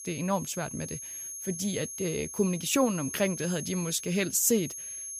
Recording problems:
high-pitched whine; loud; throughout; 6.5 kHz, 8 dB below the speech

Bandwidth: 15 kHz